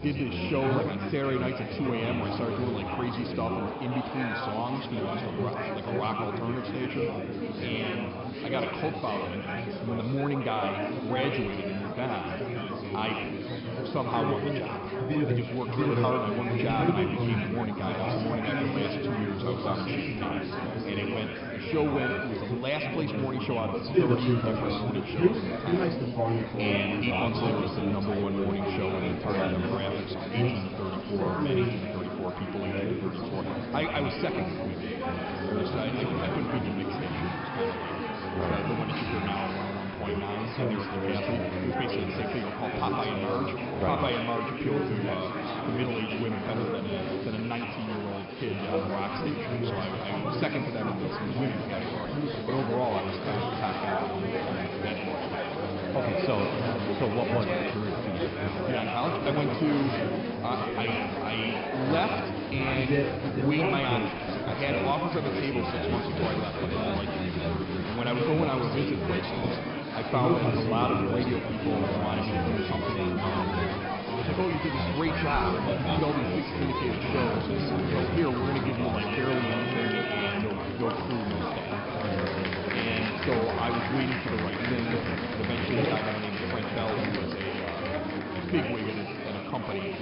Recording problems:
echo of what is said; strong; throughout; 100 ms later, 7 dB below the speech
high frequencies cut off; noticeable; nothing above 5.5 kHz
murmuring crowd; very loud; throughout; 2 dB above the speech

